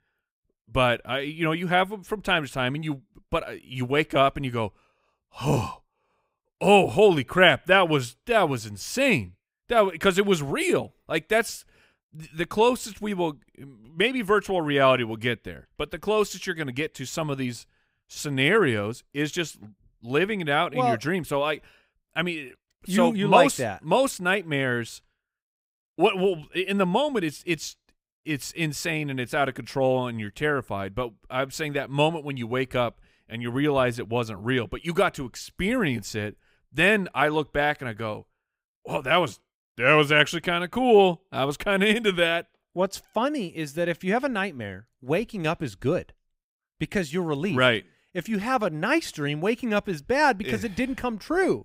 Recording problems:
none

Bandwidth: 15.5 kHz